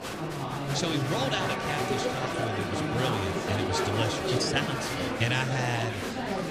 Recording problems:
murmuring crowd; very loud; throughout; 1 dB above the speech

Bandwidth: 15 kHz